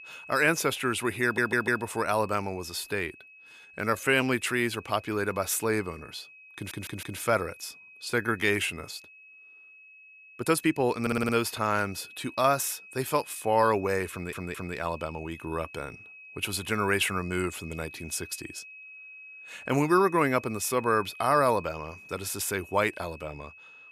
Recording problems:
high-pitched whine; noticeable; throughout; 2.5 kHz, 20 dB below the speech
audio stuttering; 4 times, first at 1 s
uneven, jittery; strongly; from 3.5 to 11 s

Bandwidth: 15 kHz